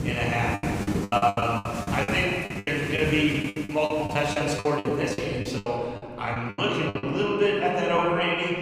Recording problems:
off-mic speech; far
room echo; noticeable; dies away in 2.1 s
rain or running water; loud; throughout; 8 dB below the speech
choppy; very; 16% of the speech affected

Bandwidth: 15.5 kHz